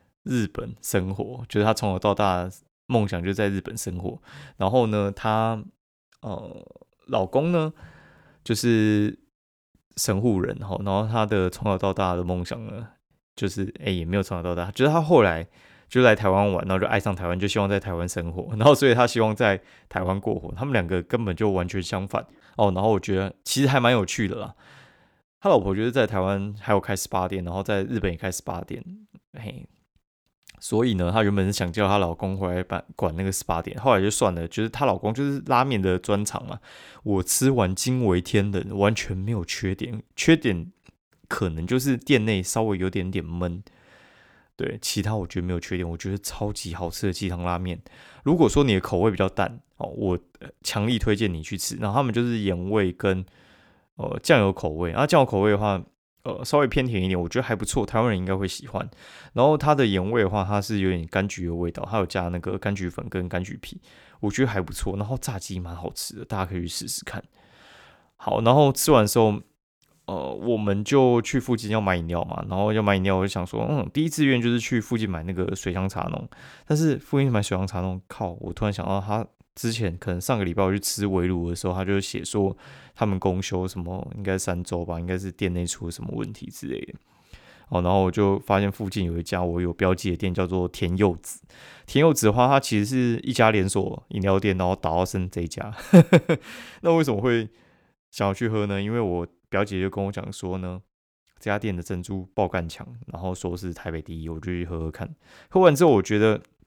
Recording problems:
none

